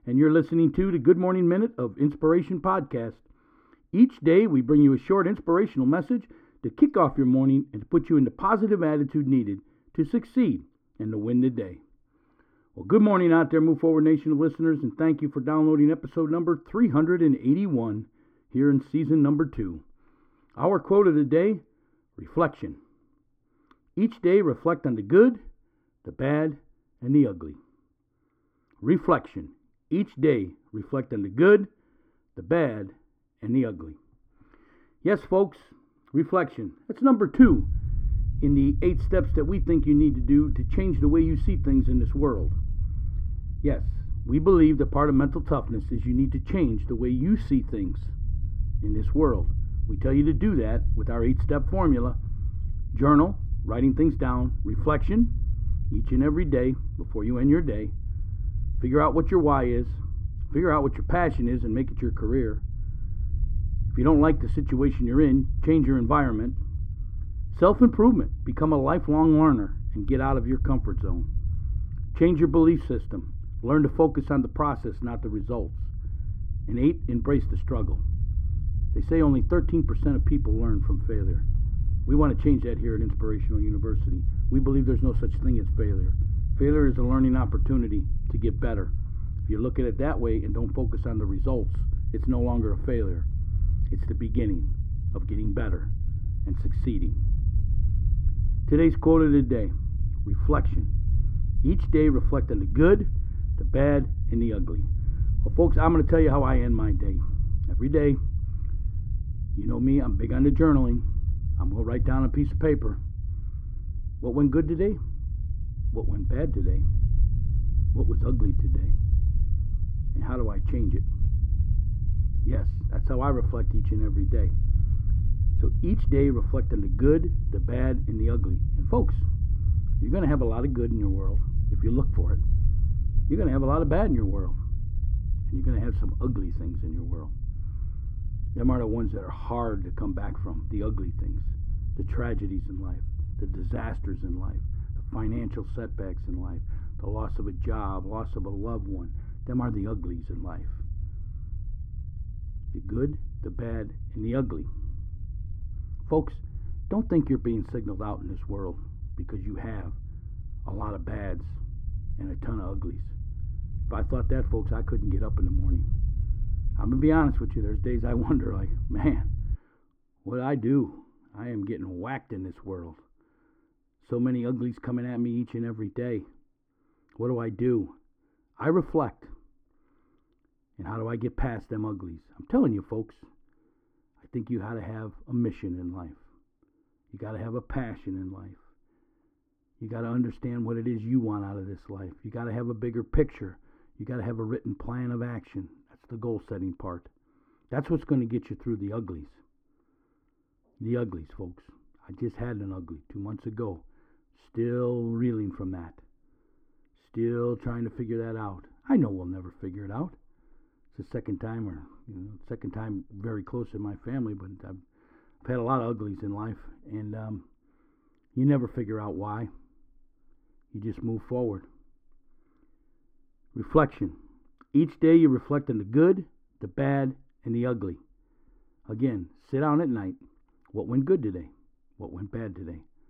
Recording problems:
muffled; very; fading above 3 kHz
low rumble; noticeable; from 37 s to 2:50; 20 dB below the speech

